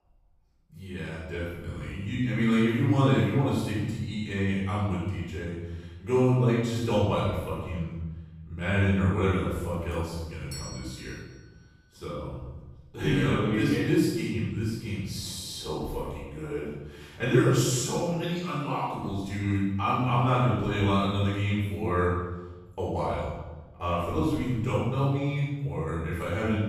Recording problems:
room echo; strong; dies away in 1.2 s
off-mic speech; far
doorbell; faint; from 9.5 to 11 s; peak 10 dB below the speech

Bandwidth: 14.5 kHz